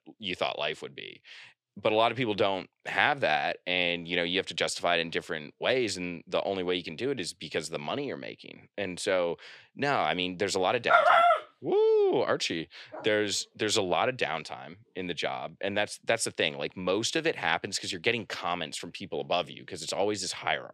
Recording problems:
thin; very slightly; fading below 350 Hz

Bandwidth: 14.5 kHz